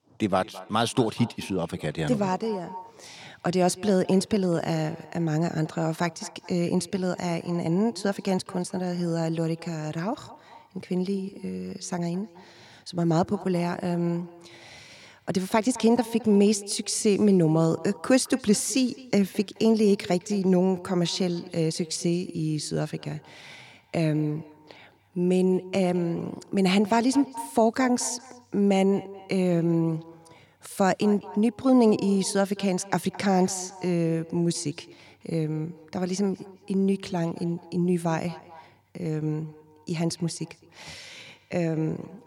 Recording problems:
echo of what is said; faint; throughout; 210 ms later, 20 dB below the speech

